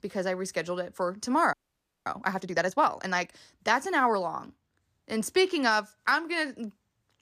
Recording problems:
audio freezing; at 1.5 s for 0.5 s

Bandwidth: 14.5 kHz